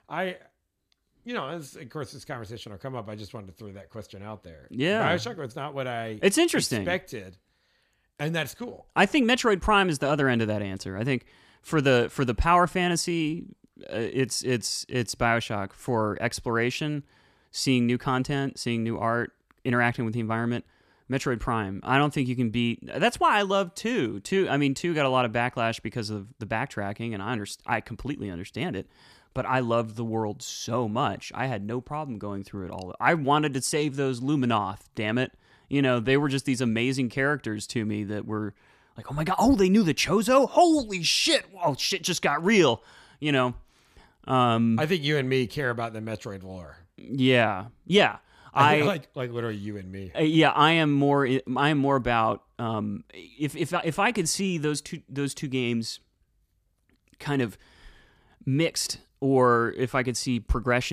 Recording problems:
abrupt cut into speech; at the end

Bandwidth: 14.5 kHz